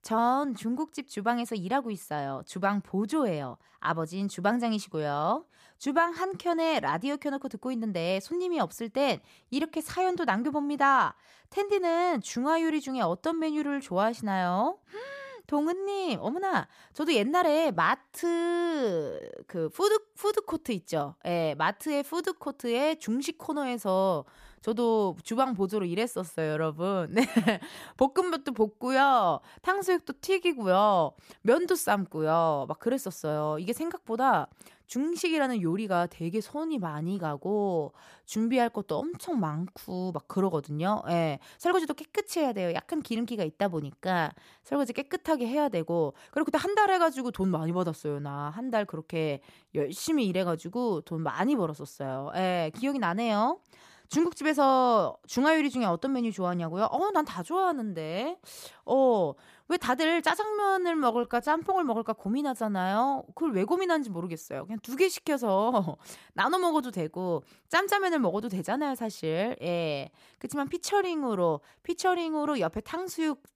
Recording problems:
uneven, jittery; strongly; from 5 s to 1:11

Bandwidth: 14.5 kHz